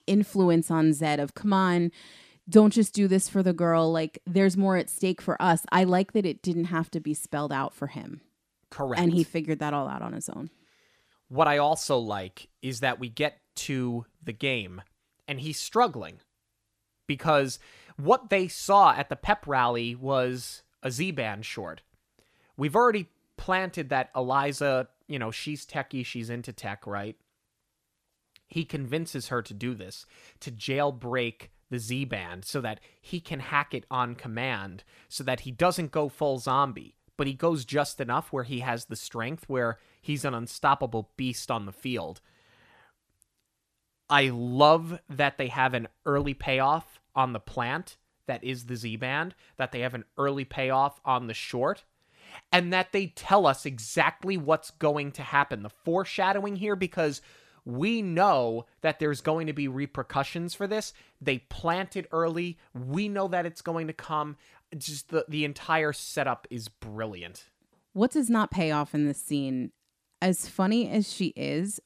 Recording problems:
none

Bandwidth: 14.5 kHz